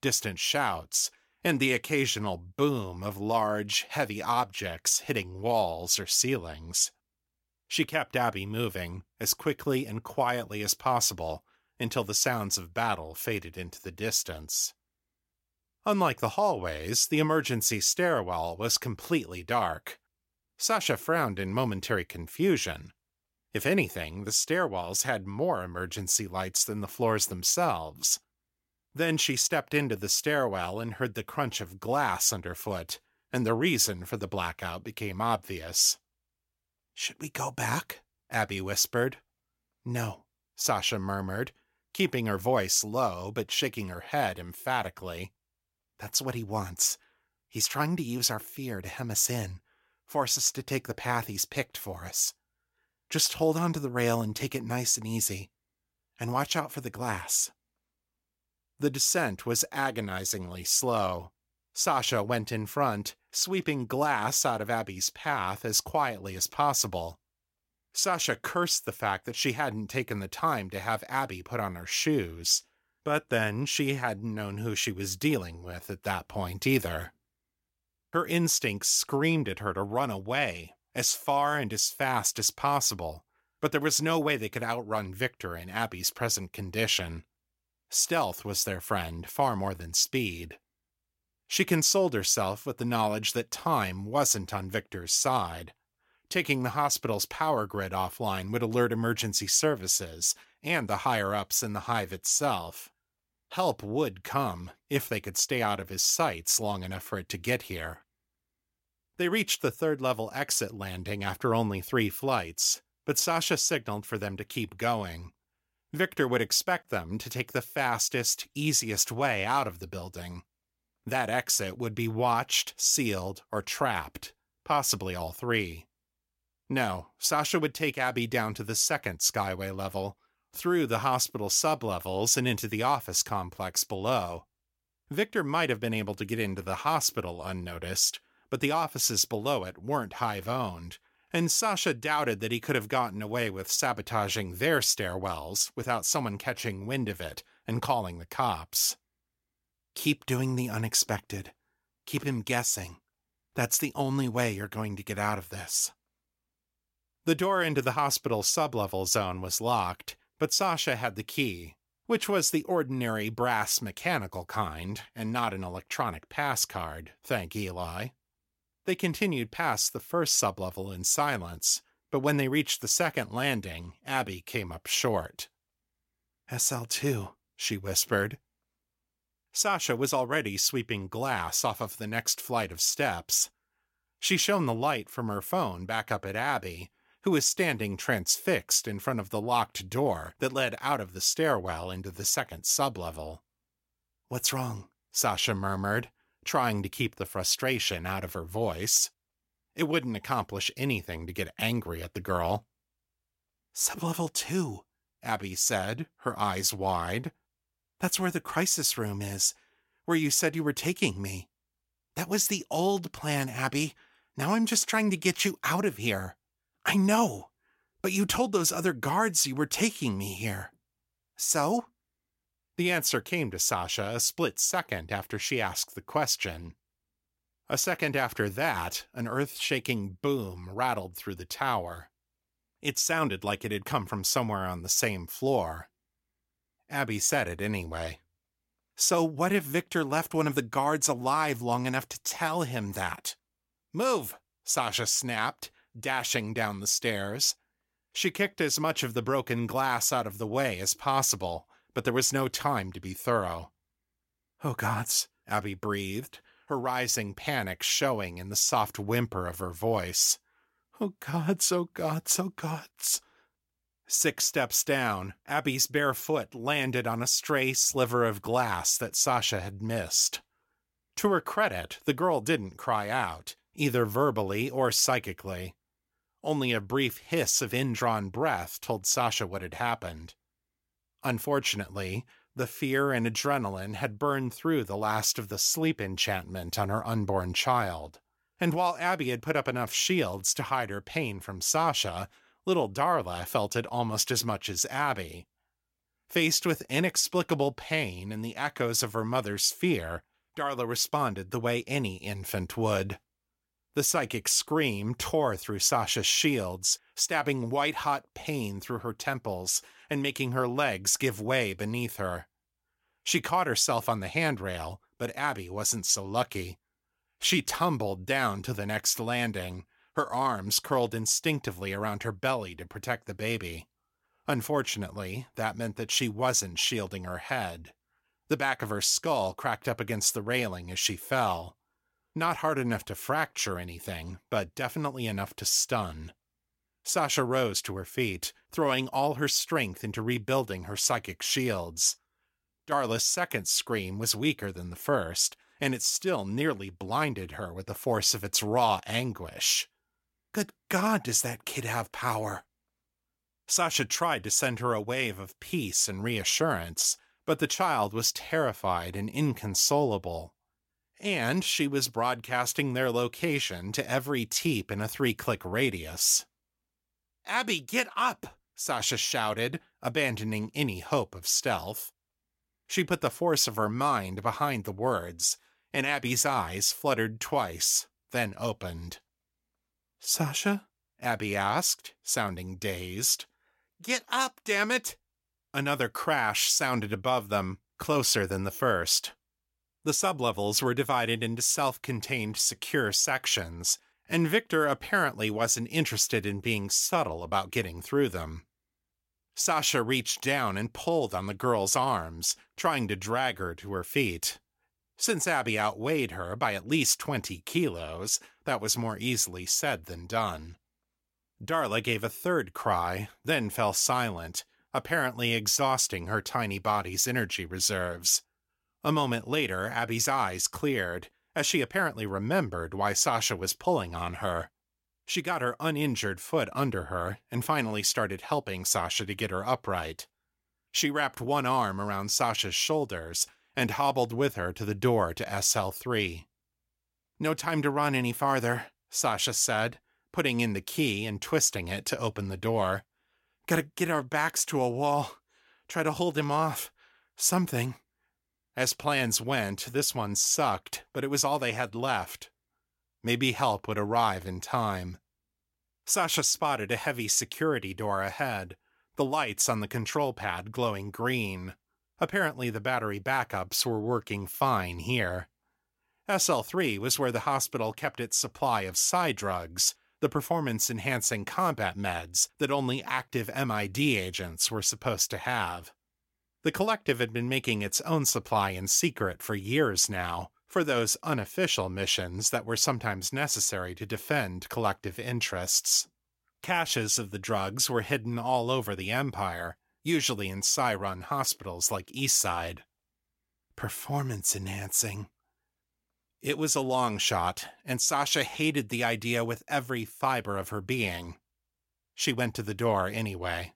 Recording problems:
none

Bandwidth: 16.5 kHz